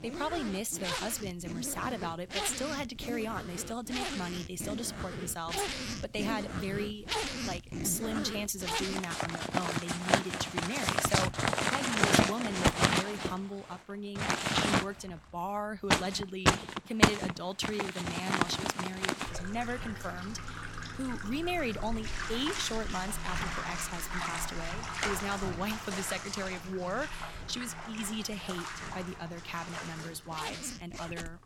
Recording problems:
household noises; very loud; throughout; 3 dB above the speech

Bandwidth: 17 kHz